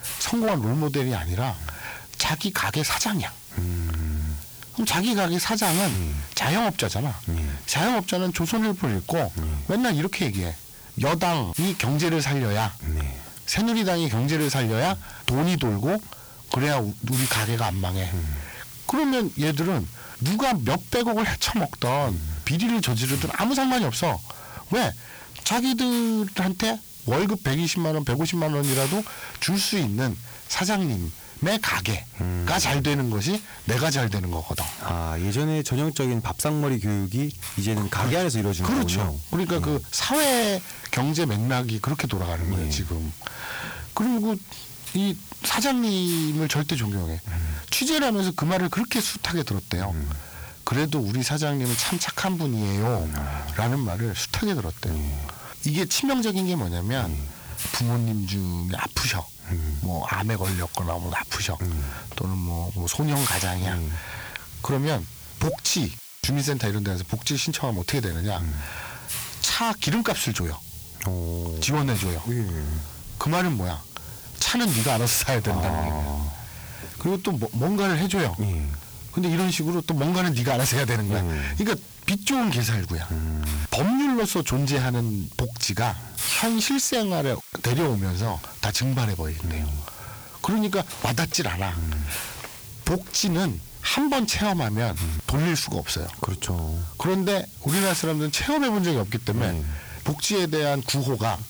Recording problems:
distortion; heavy; 13% of the sound clipped
squashed, flat; somewhat
hiss; noticeable; throughout; 10 dB below the speech

